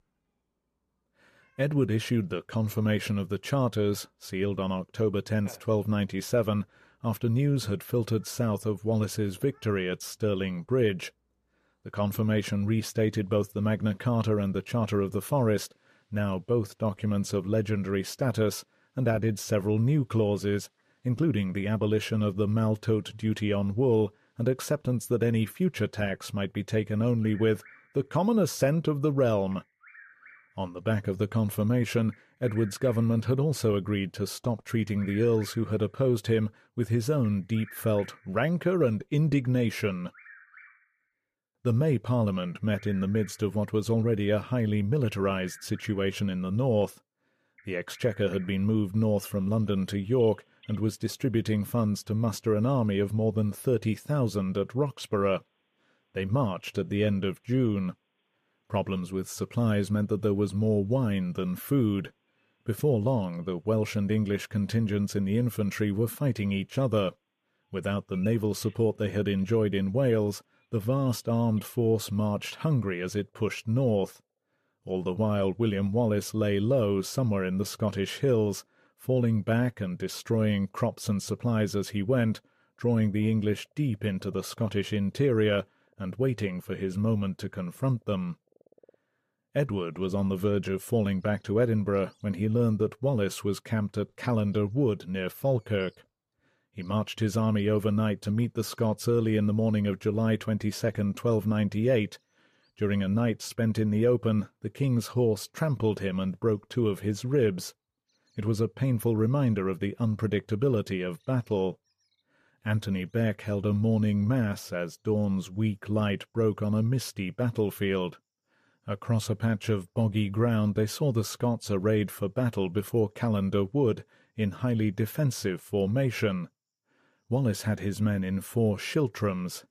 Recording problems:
animal sounds; faint; throughout; 25 dB below the speech

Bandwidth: 14.5 kHz